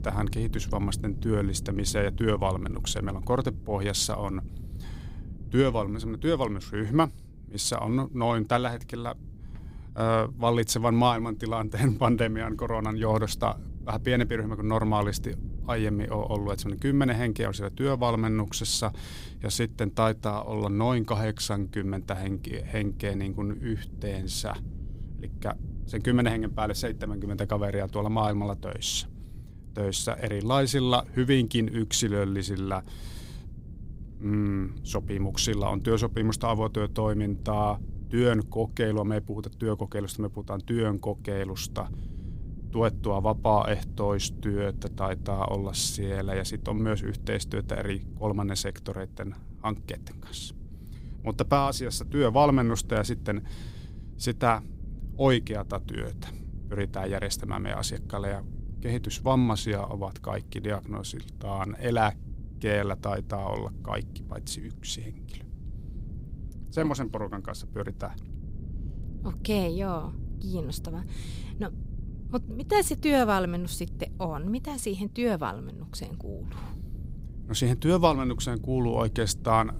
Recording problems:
wind noise on the microphone; occasional gusts; 25 dB below the speech

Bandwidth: 15.5 kHz